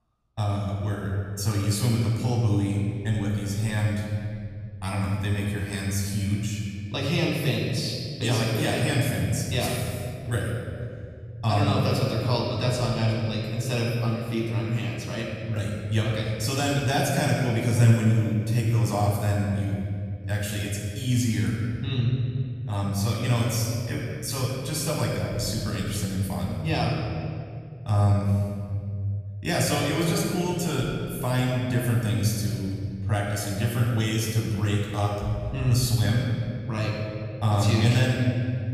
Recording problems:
off-mic speech; far
room echo; noticeable; dies away in 2.6 s

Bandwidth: 14.5 kHz